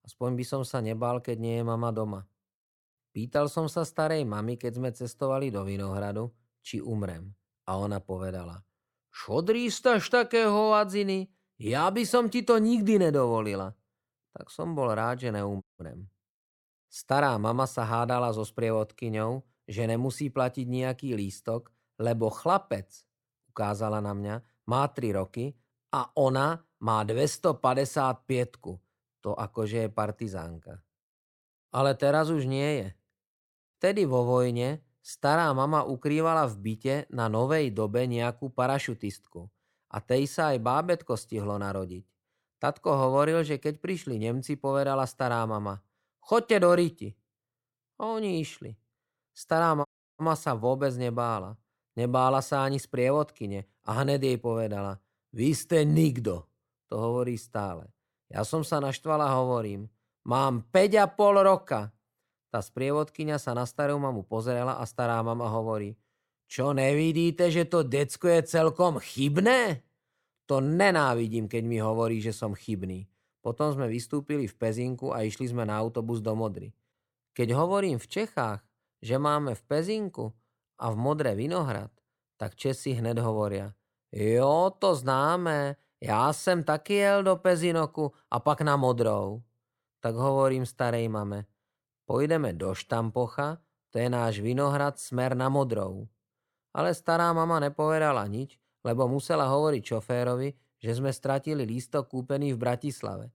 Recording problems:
audio cutting out; at 16 s and at 50 s

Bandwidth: 17 kHz